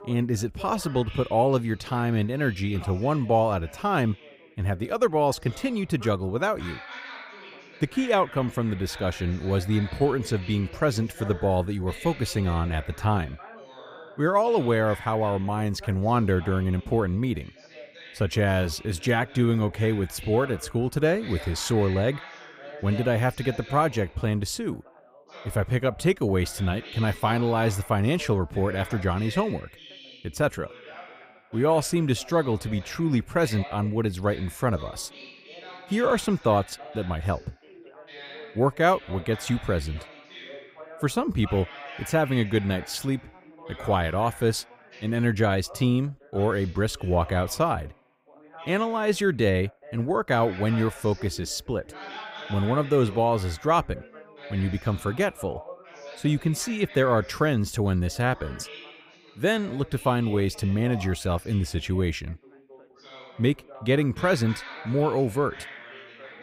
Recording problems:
background chatter; noticeable; throughout; 3 voices, 15 dB below the speech

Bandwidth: 15.5 kHz